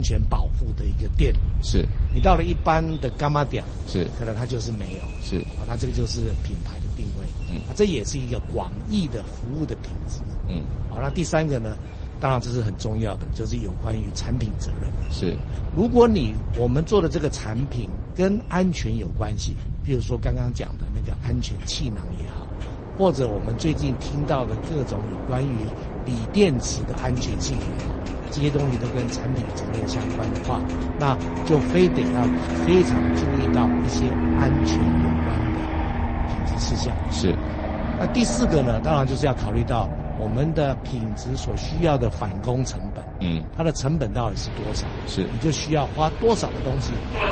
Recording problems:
garbled, watery; slightly; nothing above 8 kHz
train or aircraft noise; loud; throughout; 3 dB below the speech
low rumble; noticeable; throughout; 20 dB below the speech
household noises; faint; until 33 s; 25 dB below the speech
abrupt cut into speech; at the start

